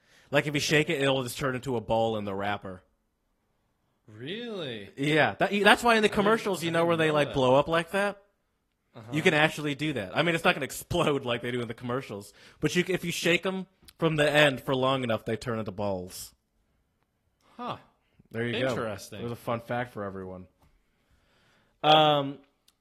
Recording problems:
garbled, watery; slightly; nothing above 13 kHz

